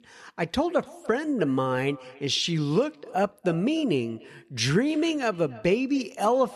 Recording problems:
echo of what is said; faint; throughout; 290 ms later, 20 dB below the speech

